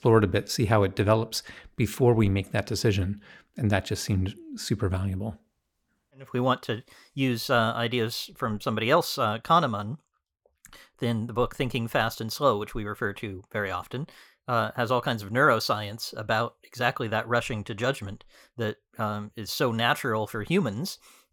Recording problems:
none

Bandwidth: 18.5 kHz